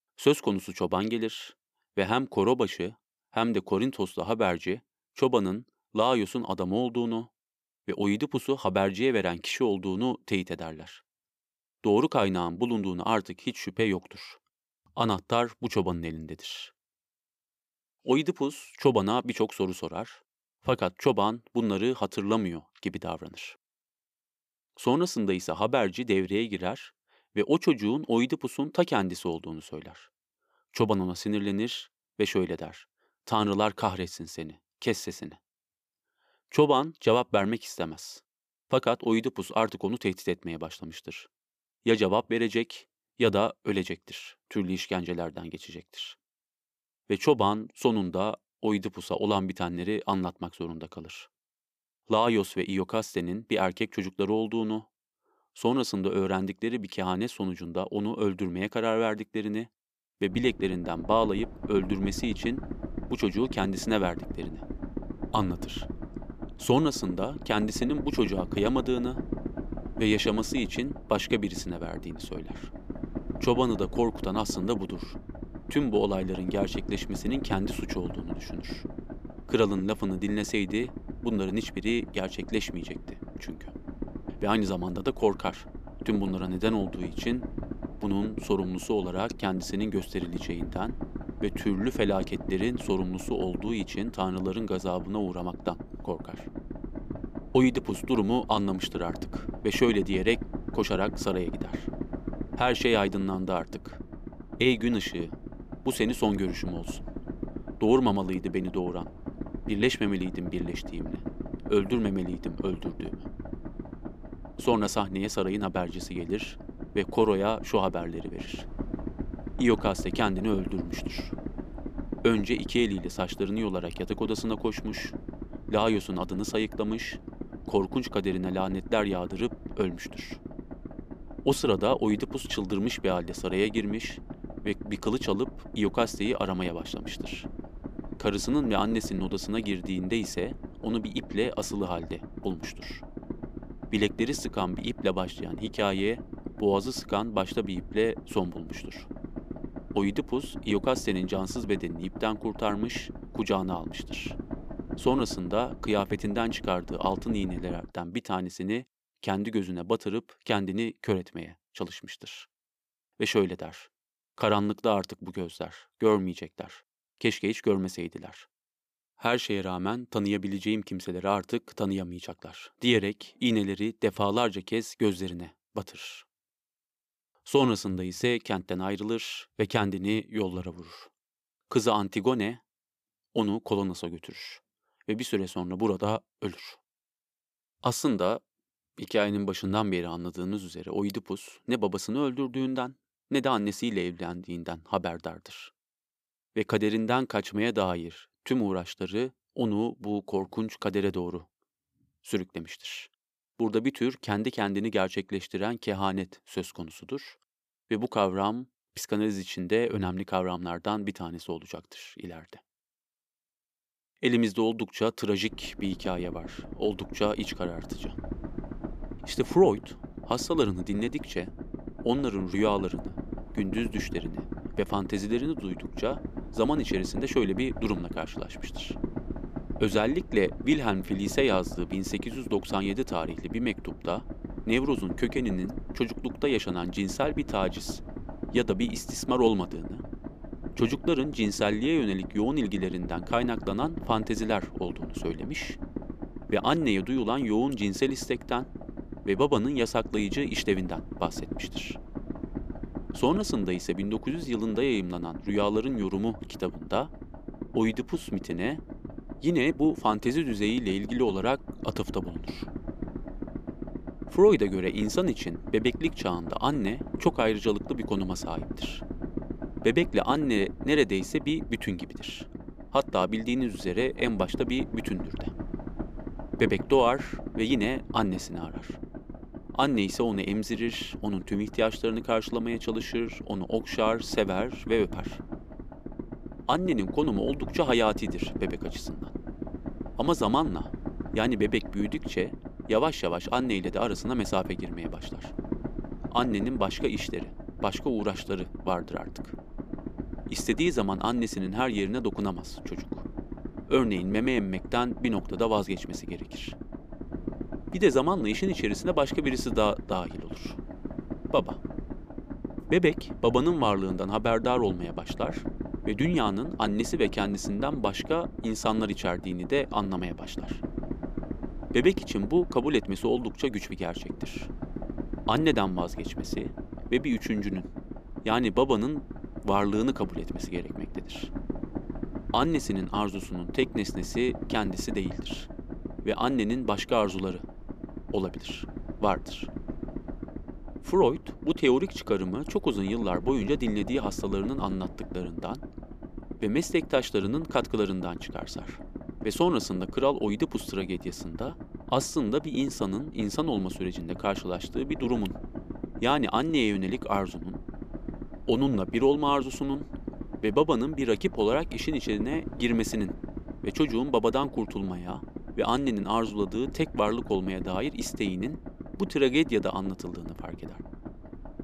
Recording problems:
low rumble; noticeable; from 1:00 to 2:38 and from 3:35 on; 15 dB below the speech

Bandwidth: 14.5 kHz